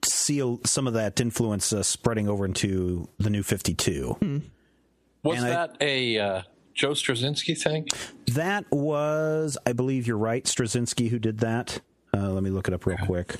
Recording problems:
squashed, flat; somewhat

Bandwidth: 14.5 kHz